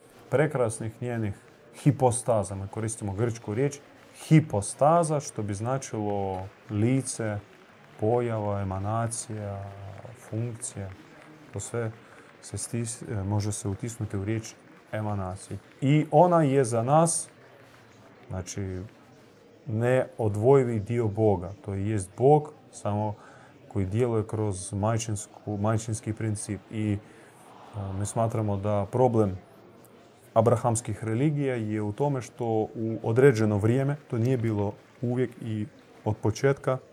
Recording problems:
murmuring crowd; faint; throughout; 25 dB below the speech

